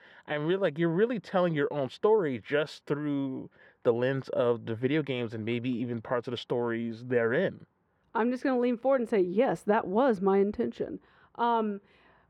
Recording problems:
muffled; very; fading above 4 kHz

